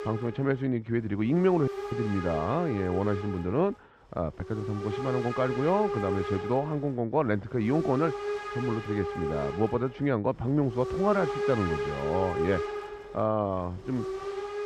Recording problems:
muffled; very; fading above 3 kHz
hiss; loud; throughout; 6 dB below the speech
audio cutting out; at 1.5 s

